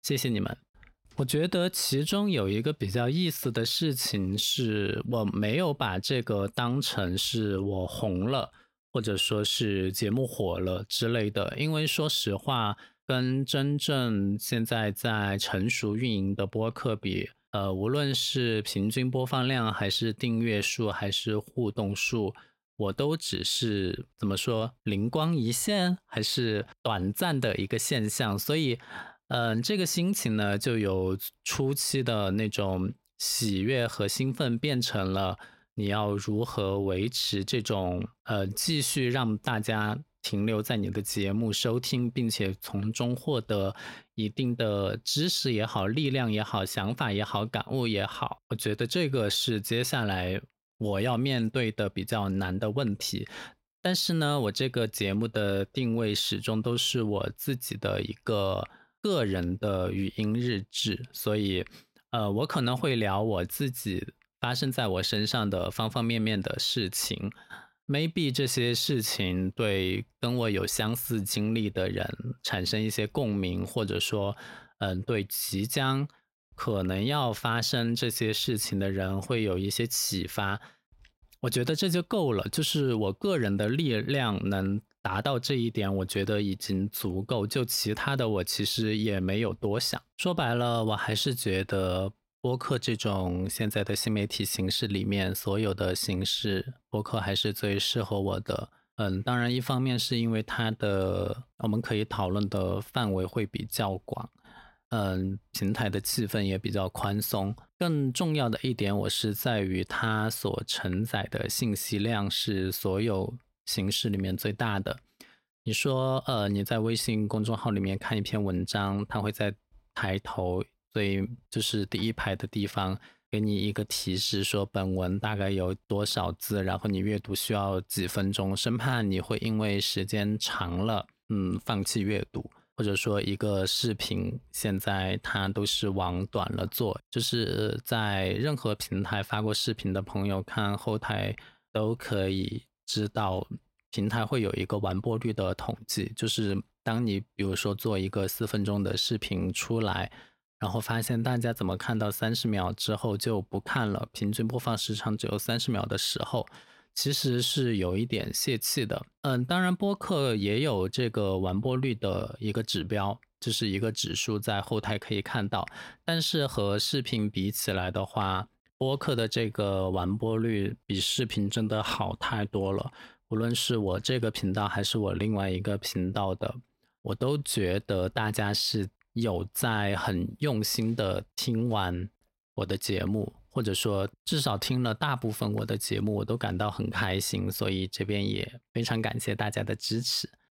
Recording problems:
none

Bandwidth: 16 kHz